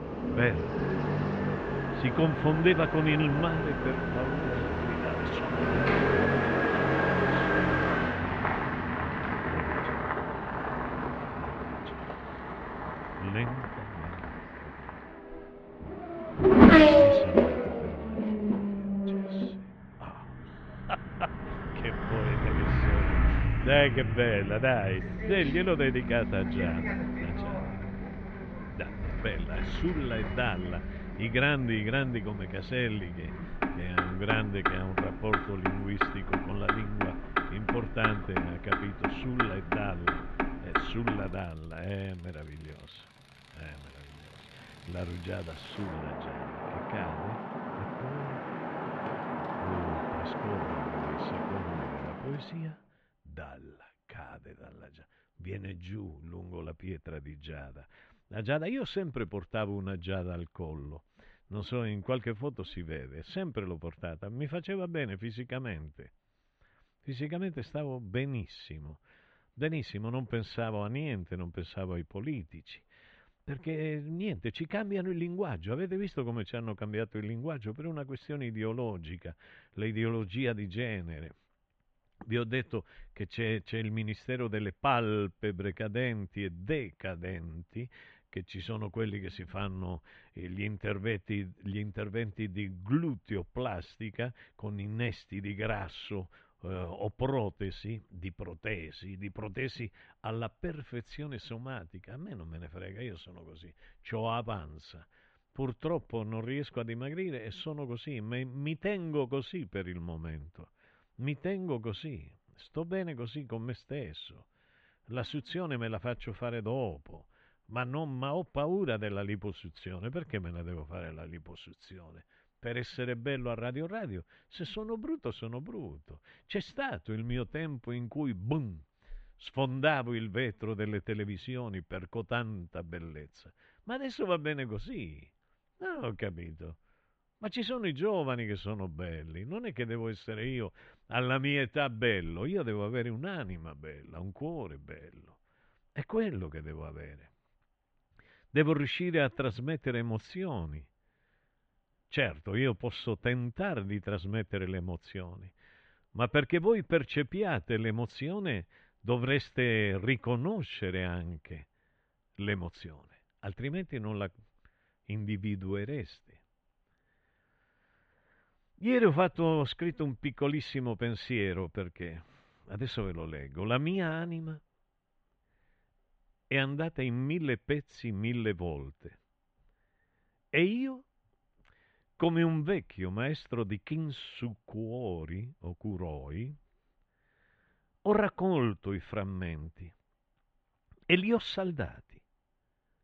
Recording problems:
muffled; slightly; fading above 3 kHz
traffic noise; very loud; until 52 s; 5 dB above the speech

